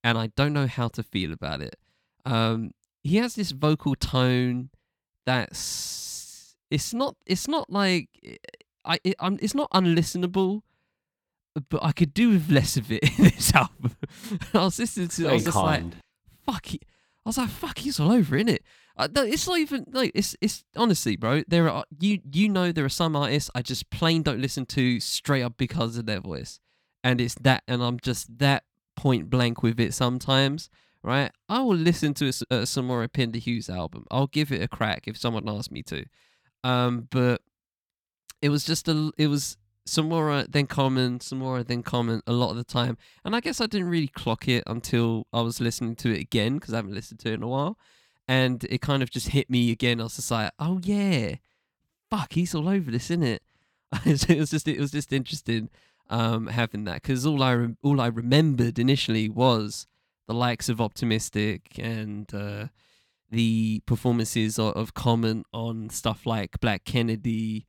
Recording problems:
uneven, jittery; strongly; from 3 to 55 s

